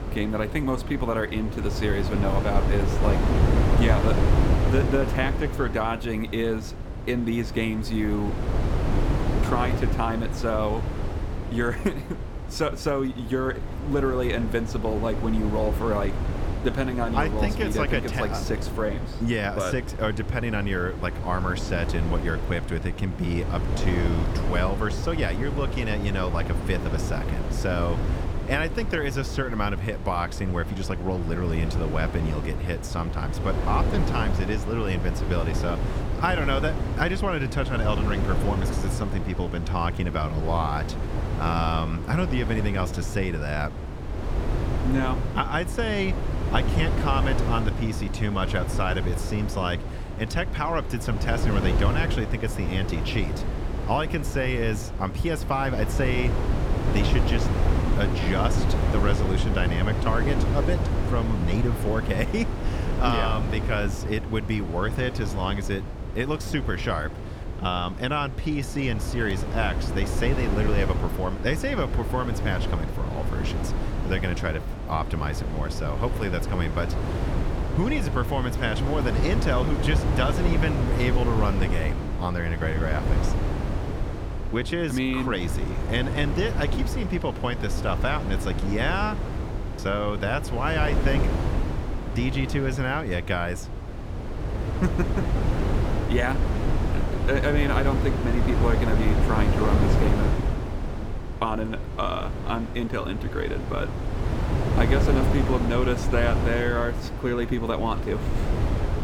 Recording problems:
wind noise on the microphone; heavy; 6 dB below the speech

